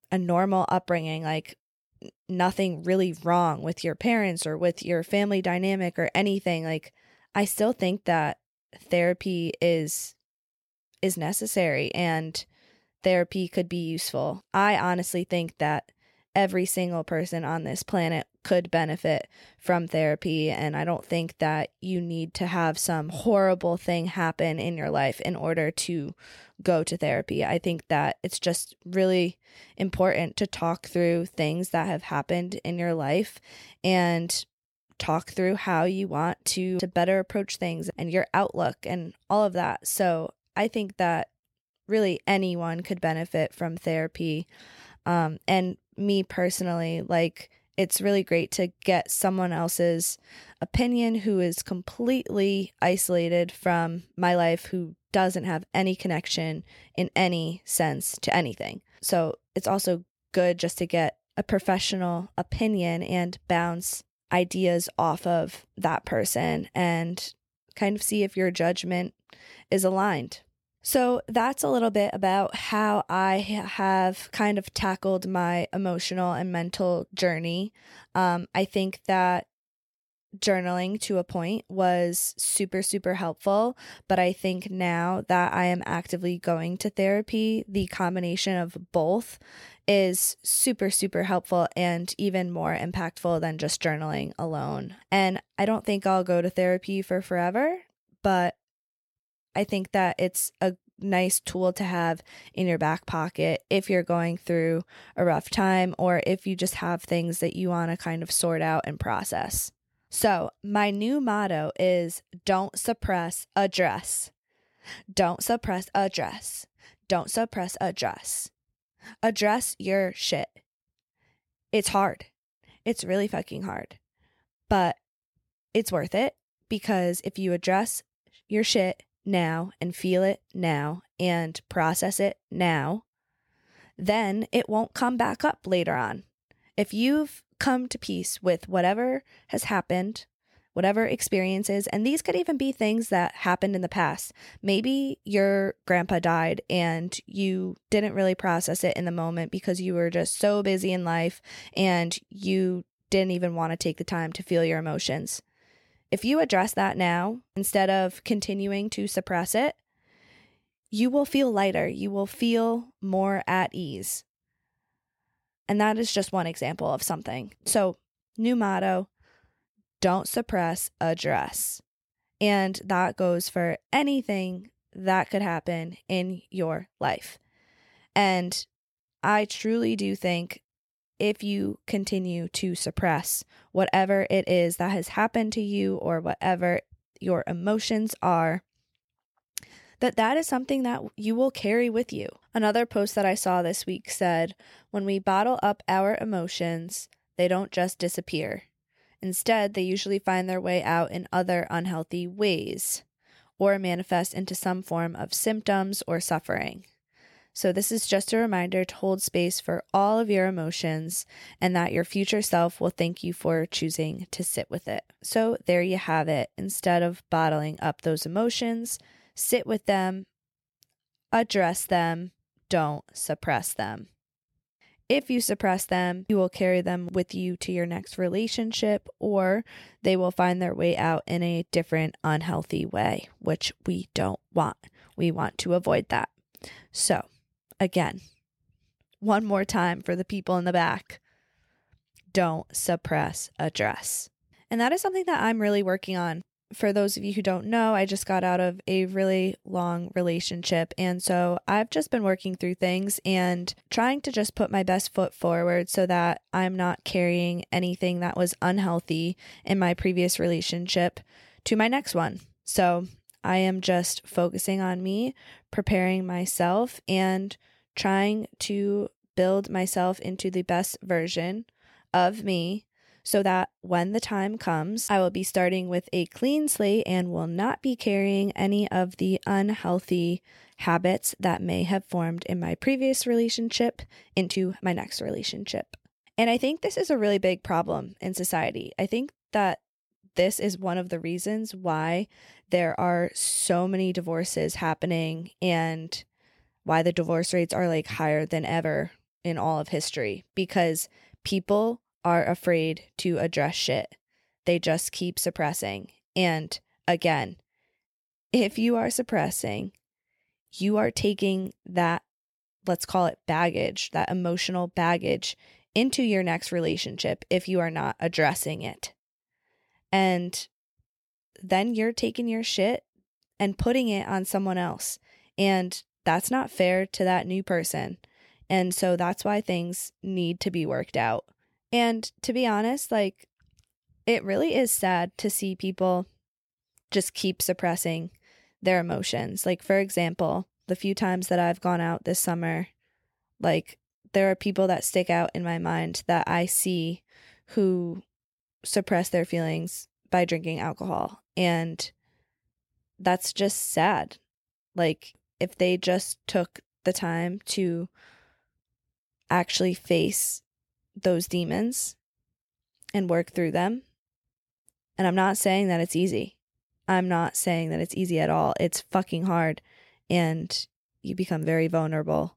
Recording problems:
uneven, jittery; strongly; from 54 s to 5:10

